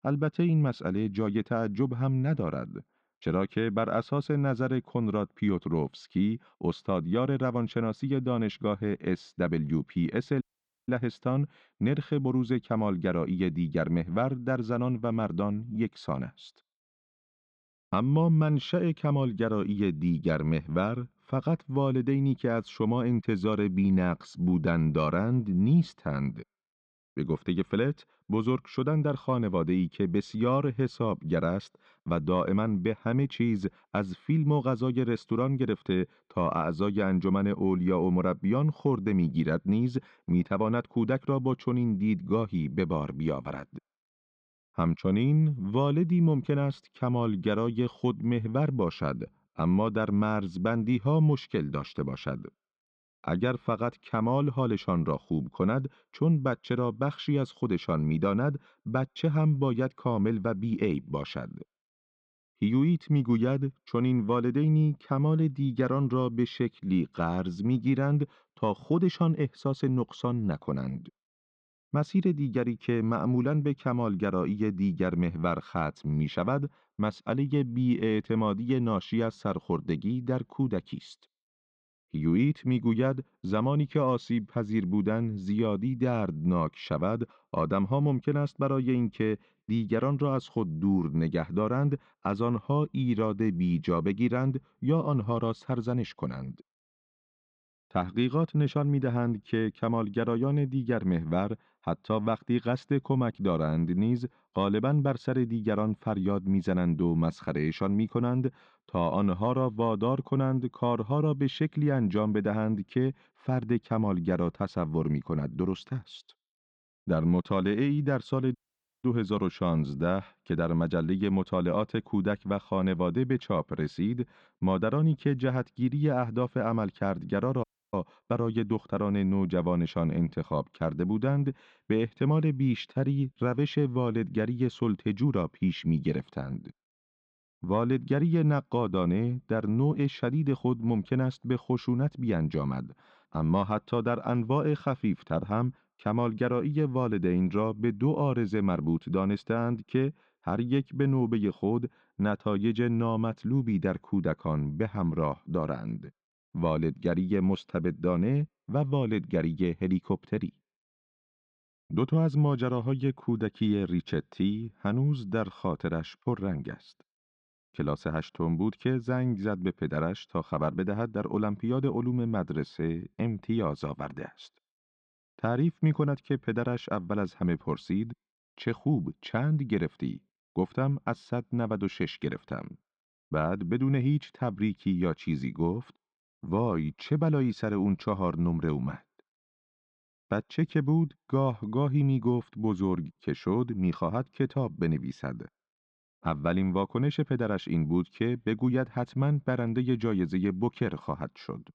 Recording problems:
muffled; slightly; fading above 4 kHz
audio cutting out; at 10 s, at 1:59 and at 2:08

